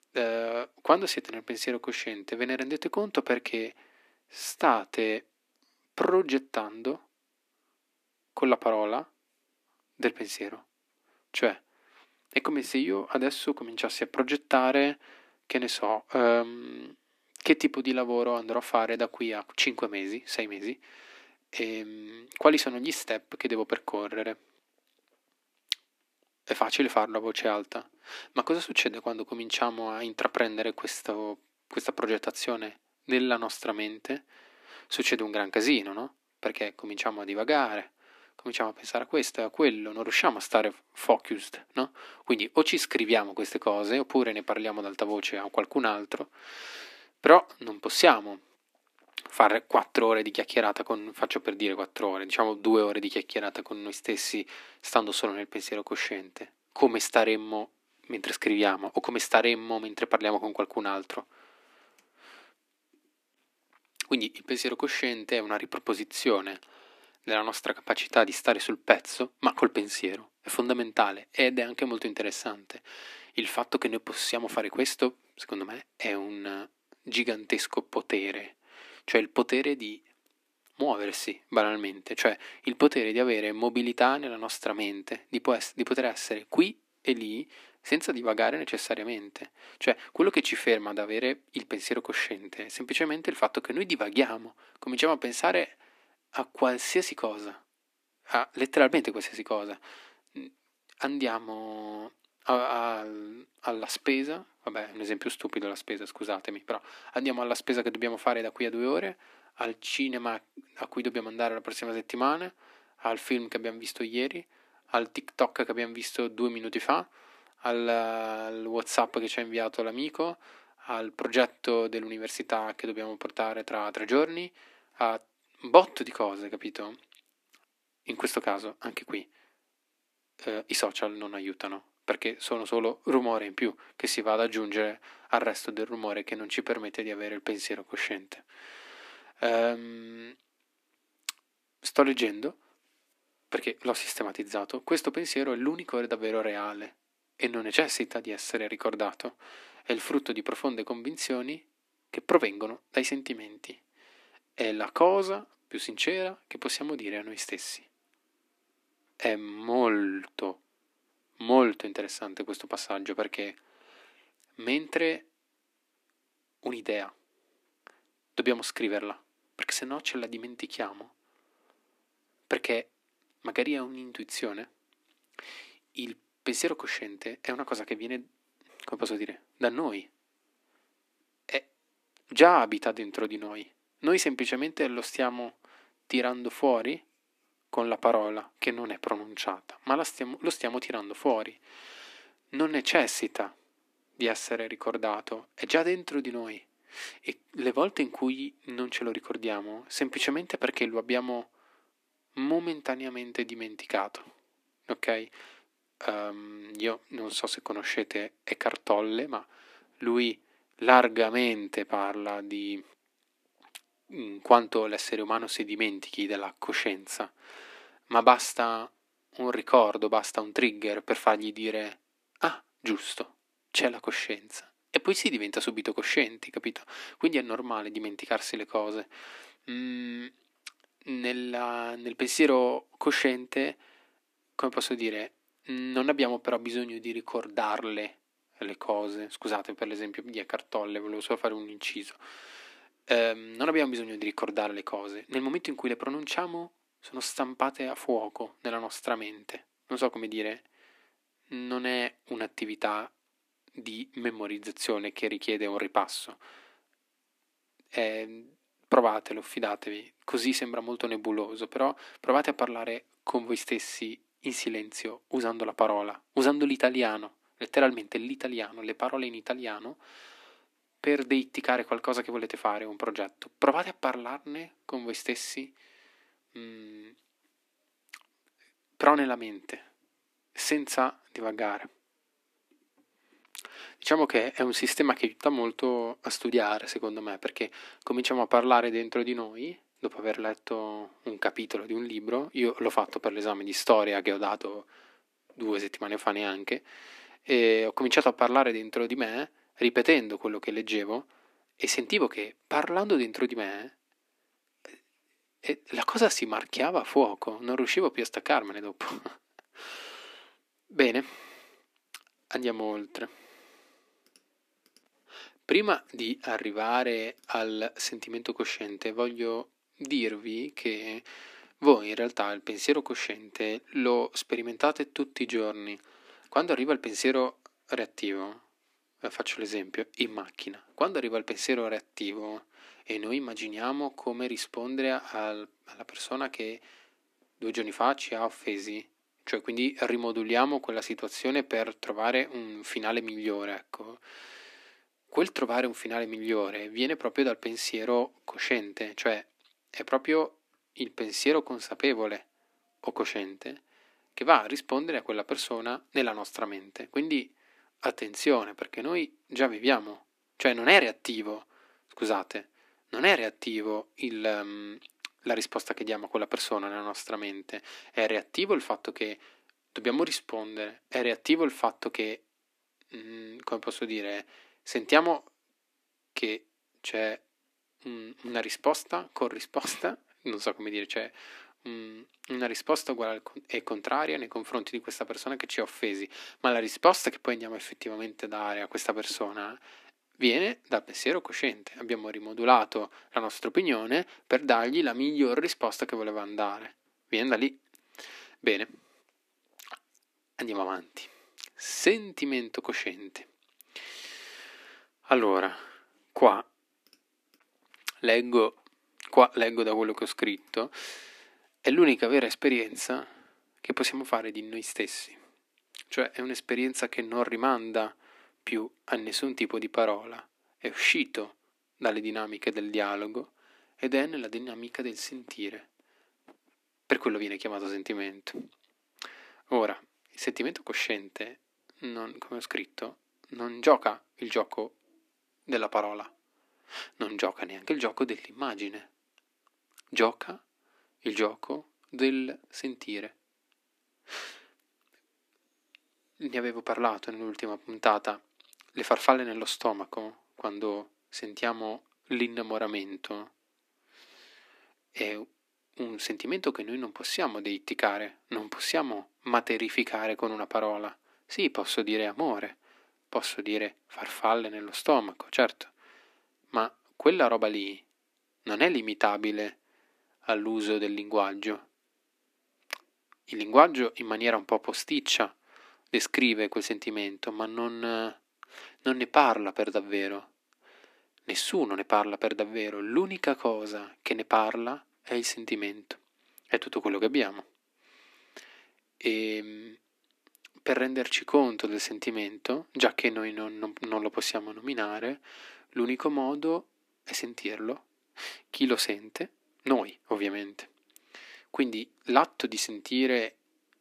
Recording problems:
thin; somewhat; fading below 250 Hz

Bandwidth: 14.5 kHz